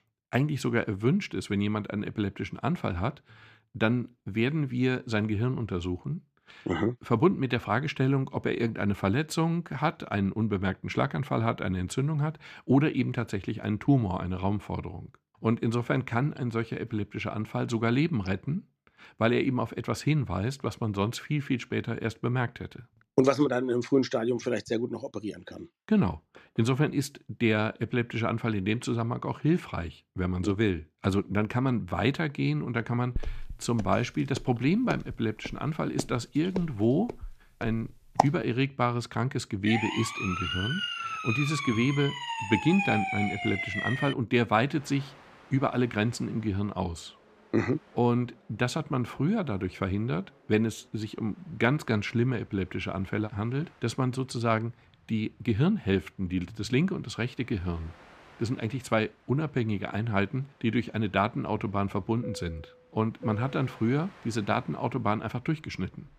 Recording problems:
train or aircraft noise; faint; from 45 s on; 25 dB below the speech
footsteps; loud; from 33 to 38 s; peak 1 dB above the speech
siren; loud; from 40 to 44 s; peak level with the speech

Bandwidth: 14.5 kHz